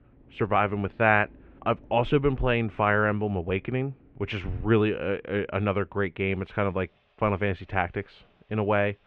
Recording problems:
muffled; very; fading above 2.5 kHz
machinery noise; faint; throughout; 30 dB below the speech

